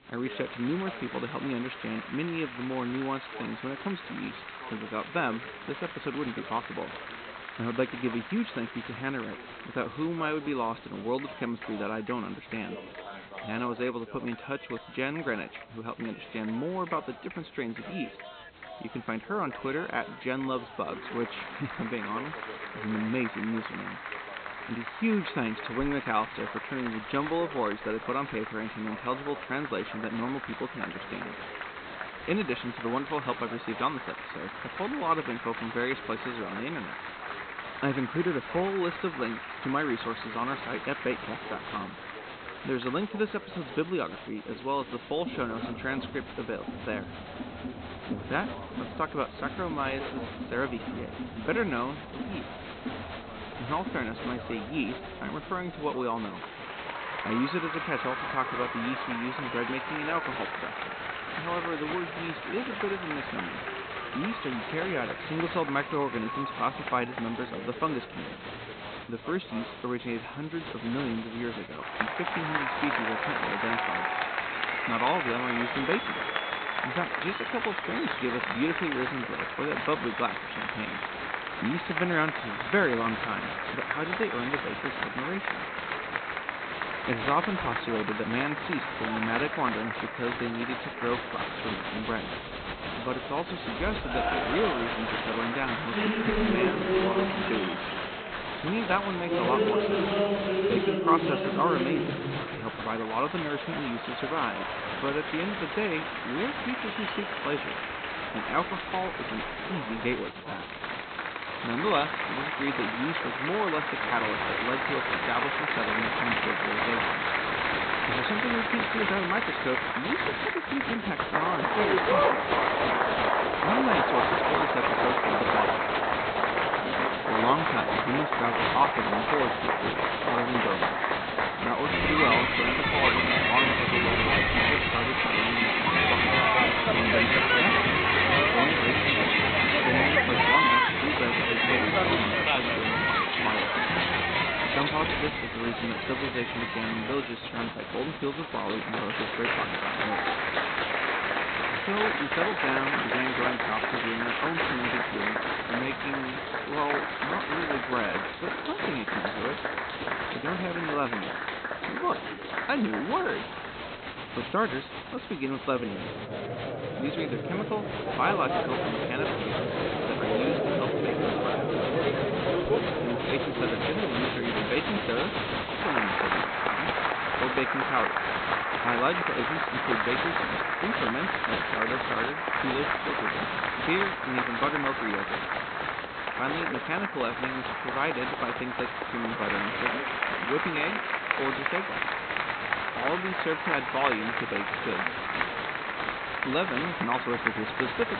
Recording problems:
high frequencies cut off; severe; nothing above 4 kHz
crowd noise; very loud; throughout; 4 dB above the speech
voice in the background; noticeable; throughout; 15 dB below the speech
hiss; faint; throughout; 25 dB below the speech

